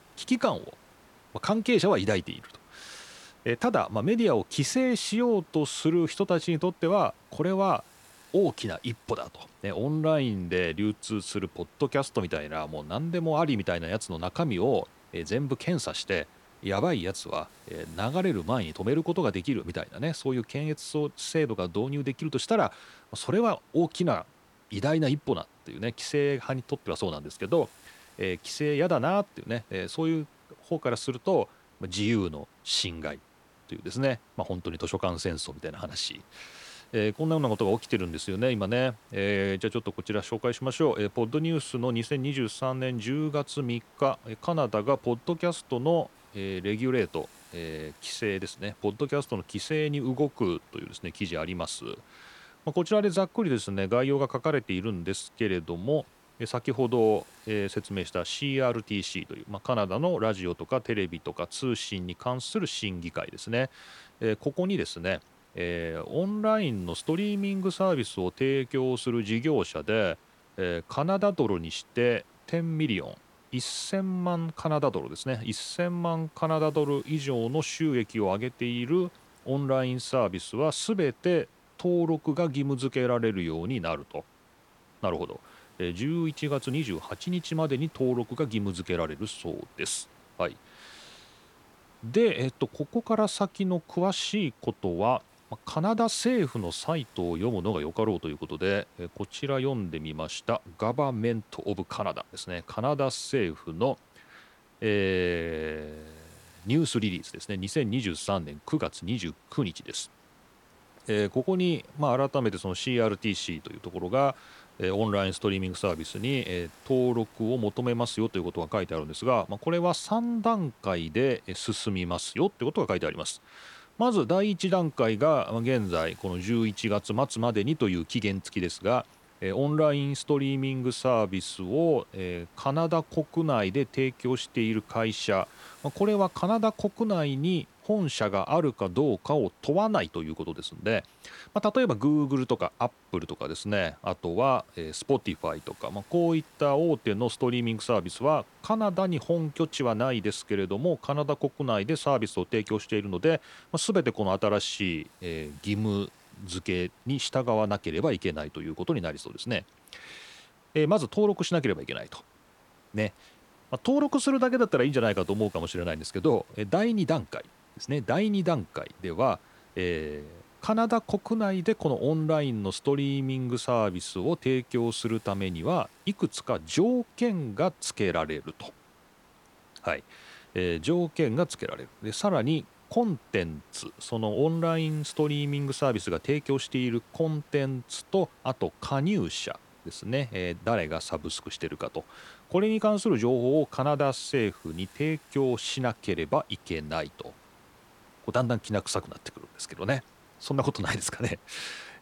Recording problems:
hiss; faint; throughout; 30 dB below the speech

